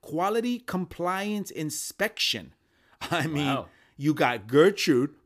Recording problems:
none

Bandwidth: 15 kHz